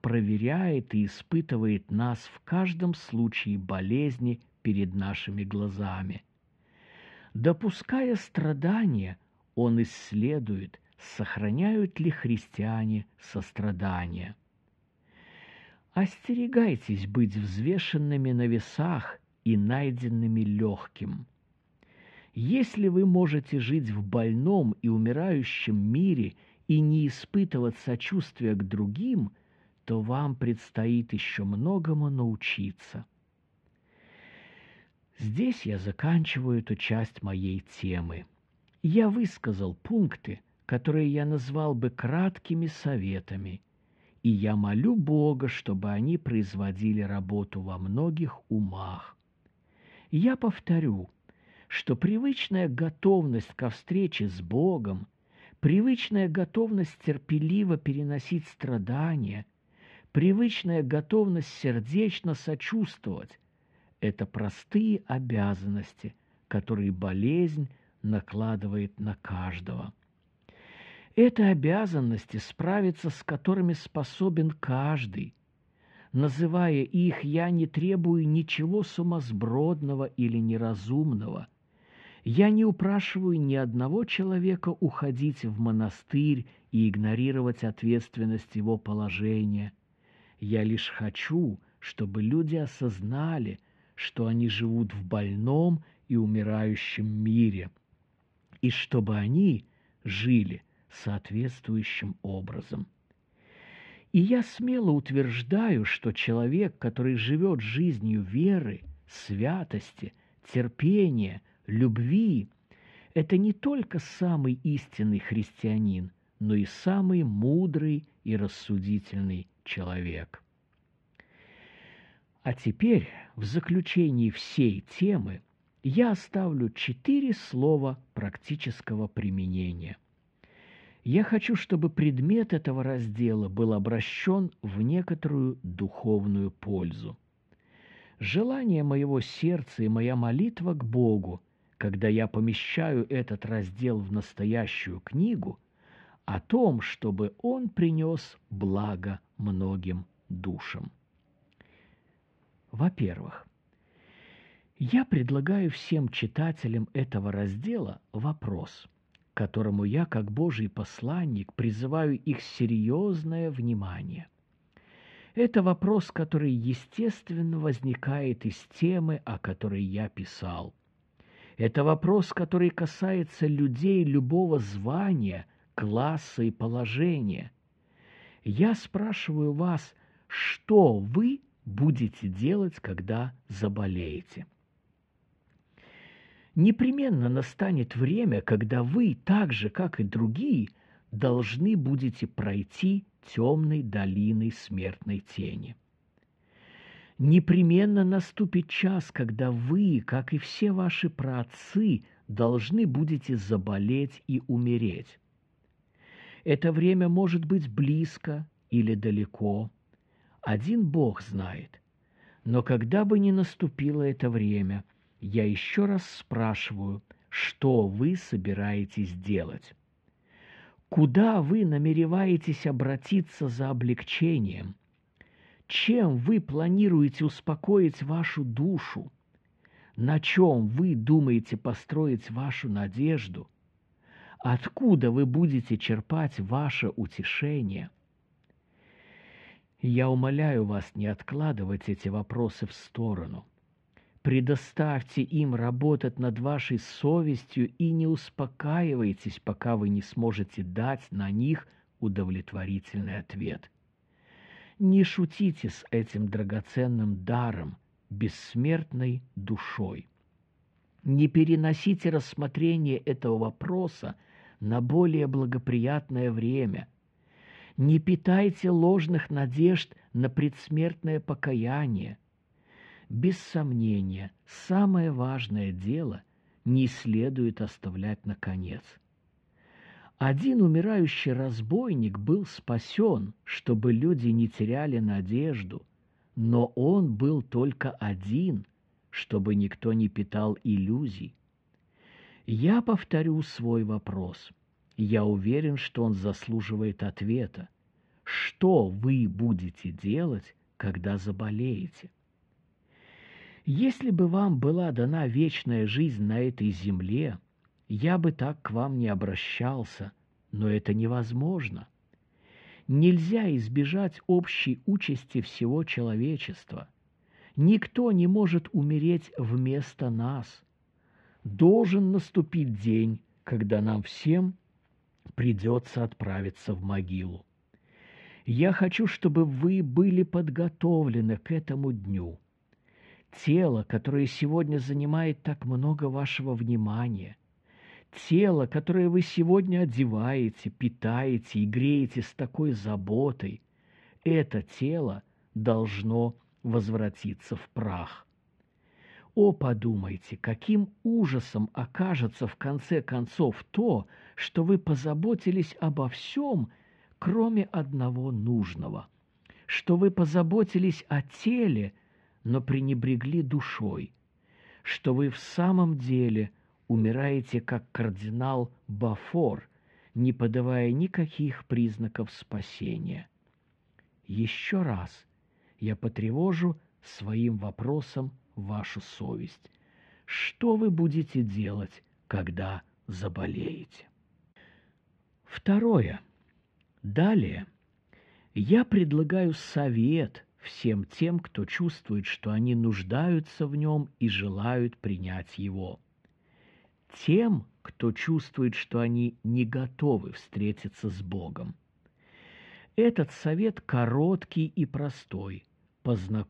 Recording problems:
muffled; very; fading above 2.5 kHz

